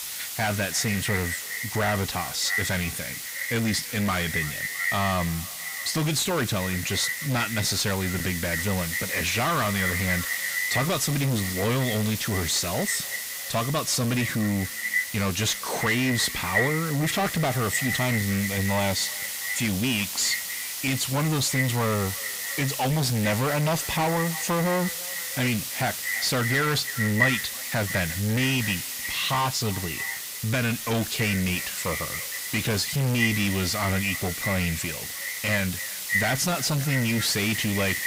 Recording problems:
distortion; heavy; 7 dB below the speech
echo of what is said; strong; throughout; 330 ms later, 6 dB below the speech
hiss; loud; throughout; 6 dB below the speech

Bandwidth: 15.5 kHz